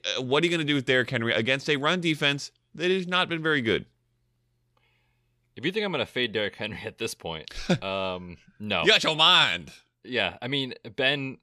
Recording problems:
none

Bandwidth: 15 kHz